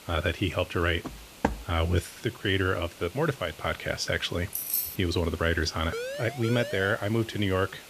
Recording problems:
hiss; noticeable; throughout; 20 dB below the speech
footsteps; noticeable; at 1 s; peak 3 dB below the speech
jangling keys; loud; at 4.5 s; peak 1 dB above the speech
siren; noticeable; from 6 to 7 s; peak 6 dB below the speech

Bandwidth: 14.5 kHz